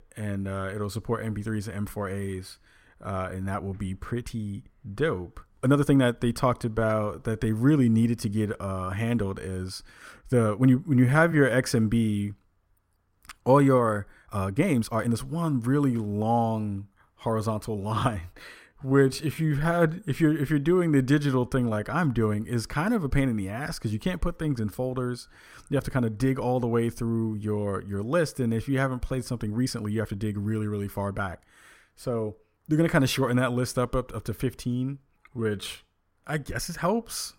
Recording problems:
uneven, jittery; strongly; from 2.5 to 37 s

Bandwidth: 16 kHz